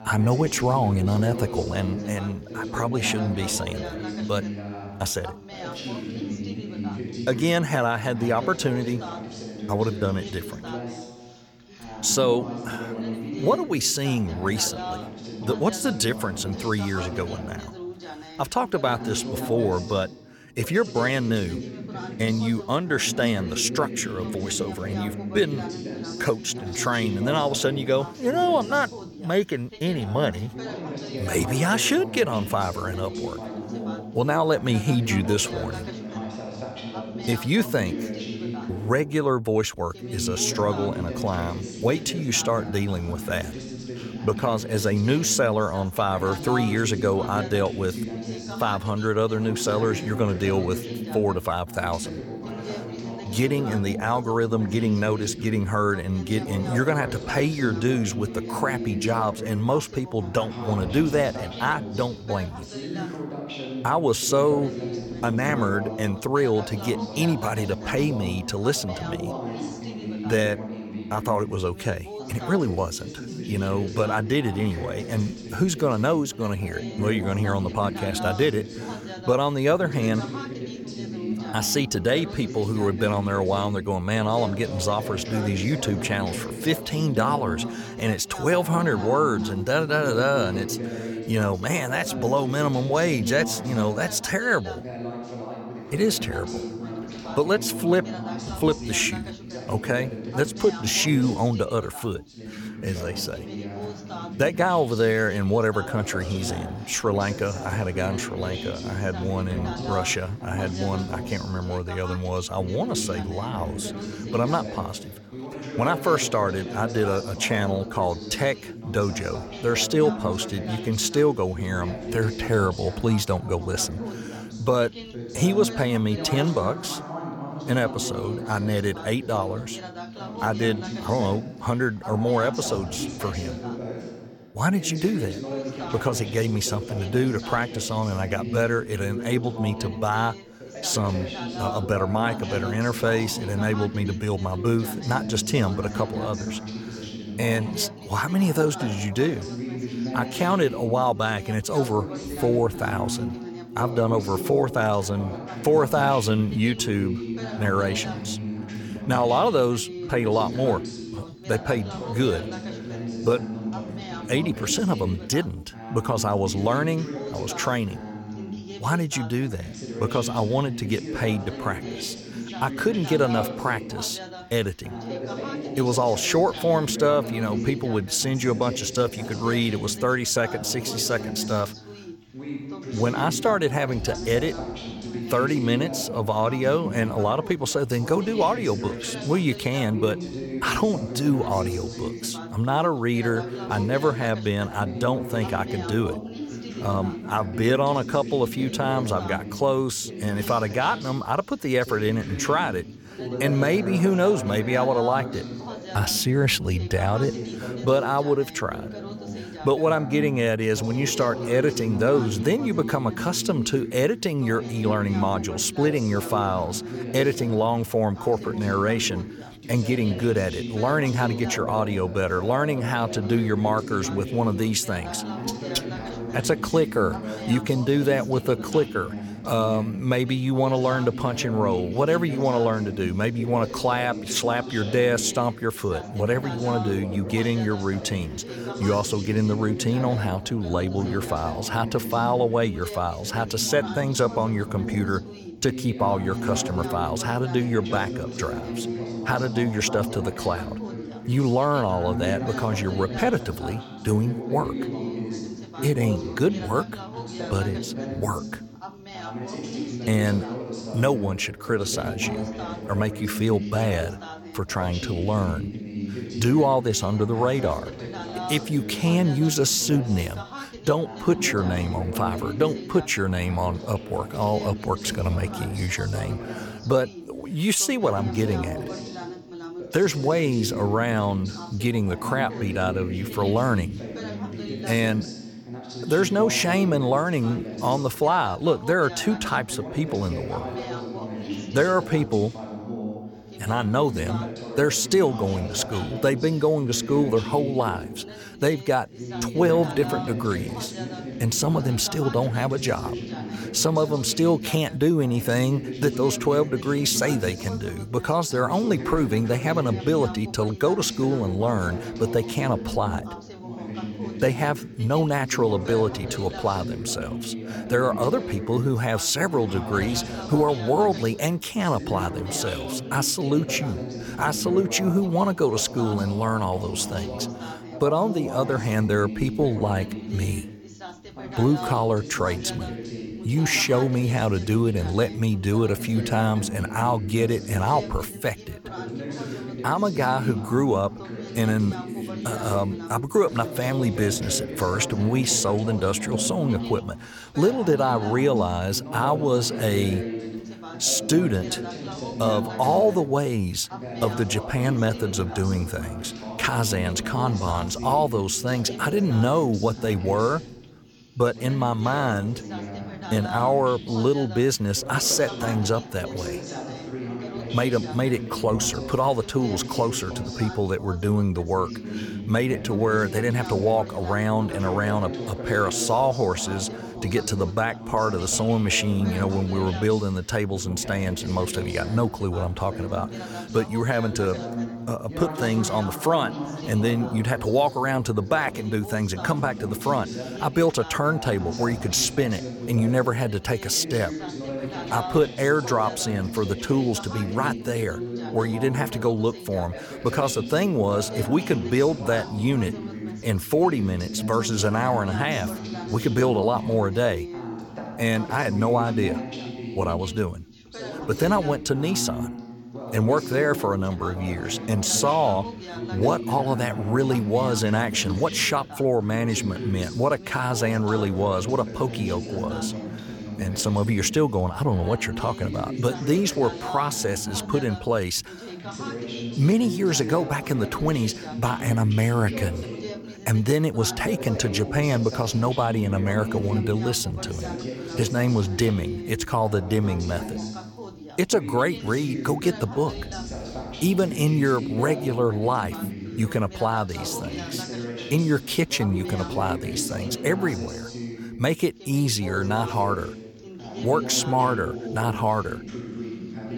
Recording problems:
background chatter; loud; throughout; 2 voices, 9 dB below the speech

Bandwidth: 18 kHz